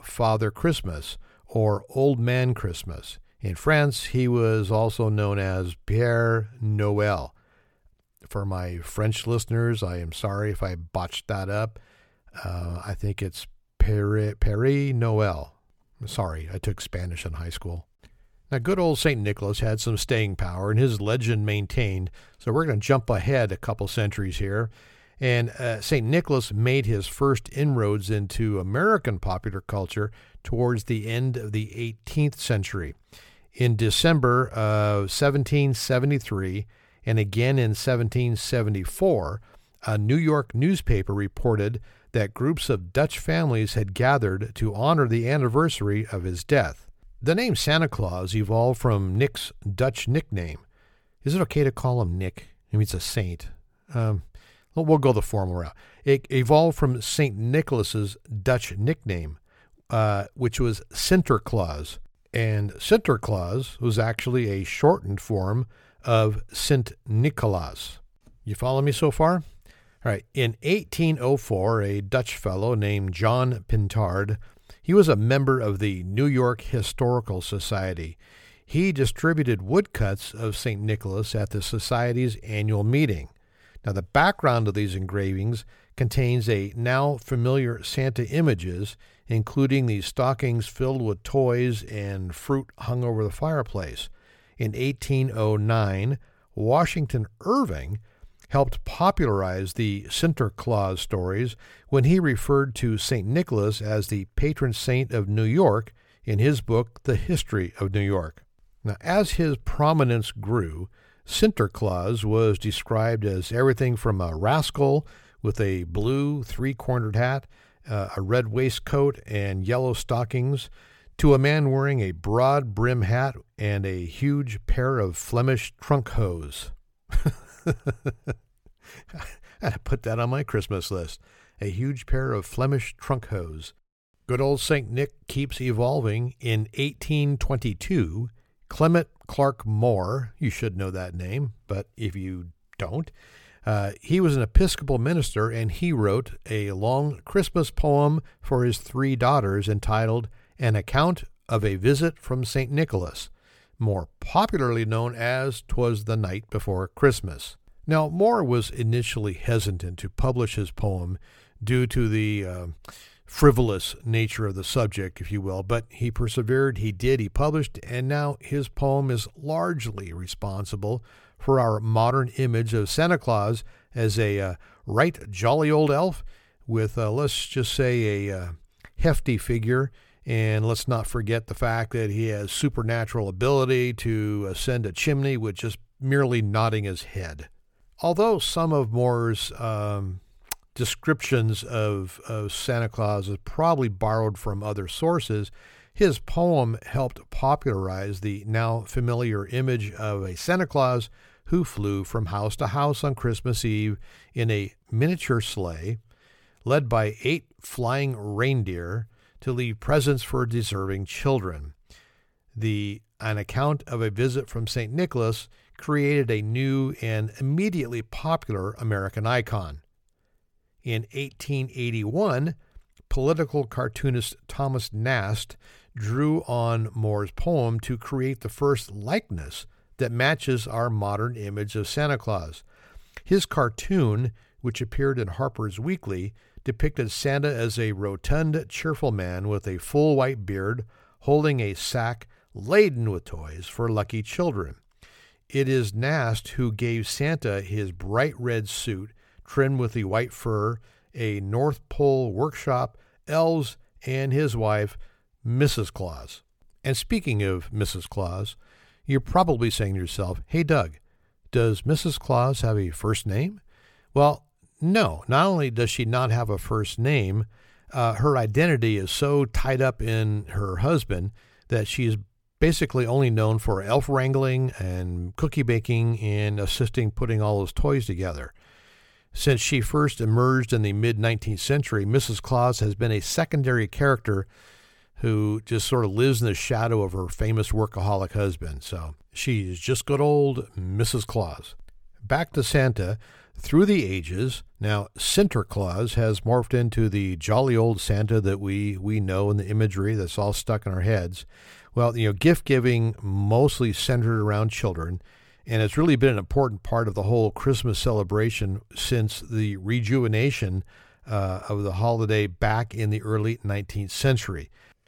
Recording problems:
none

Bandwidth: 17.5 kHz